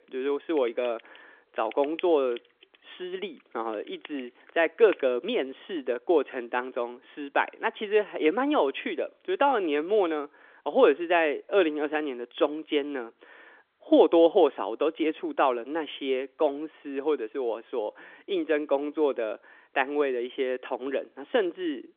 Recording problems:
phone-call audio; nothing above 3.5 kHz
keyboard typing; faint; from 0.5 to 5 s; peak 15 dB below the speech

